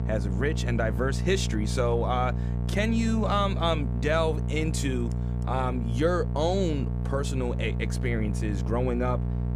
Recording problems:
electrical hum; noticeable; throughout; 60 Hz, 10 dB below the speech

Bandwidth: 15 kHz